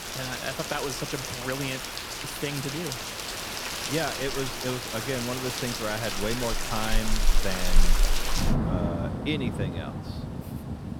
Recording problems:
rain or running water; very loud; throughout; 2 dB above the speech

